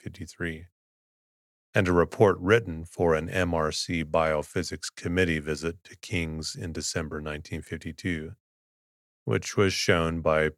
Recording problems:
none

